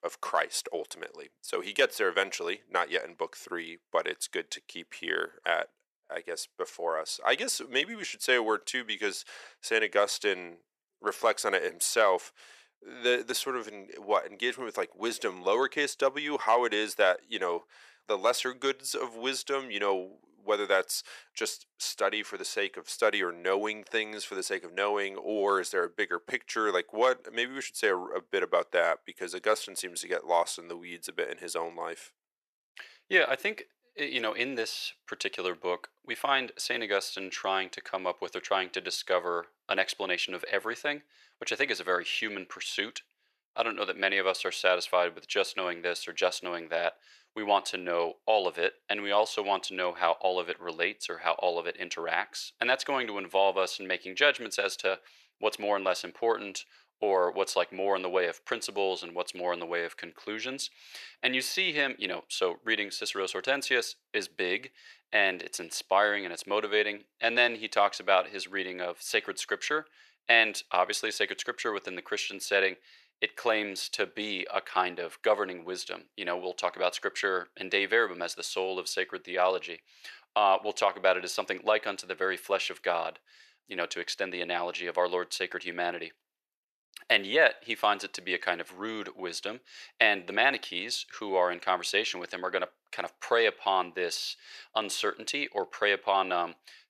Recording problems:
thin; very; fading below 450 Hz

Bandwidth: 14 kHz